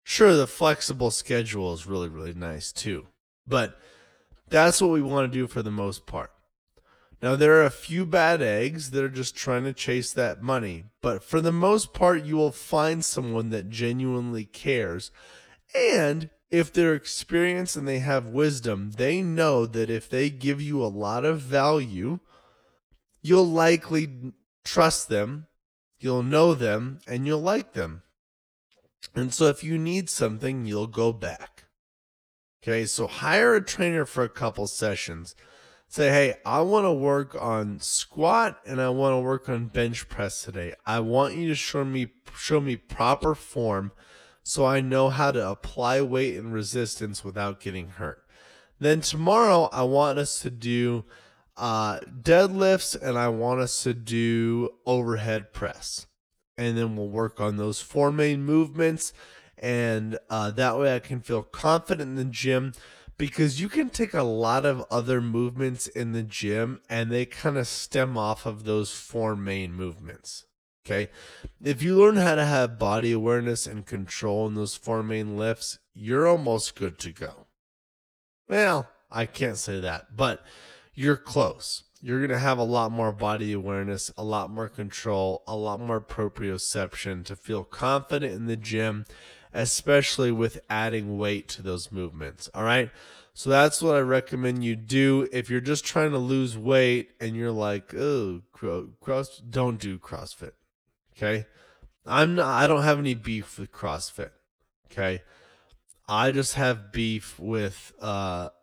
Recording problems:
wrong speed, natural pitch; too slow; 0.6 times normal speed

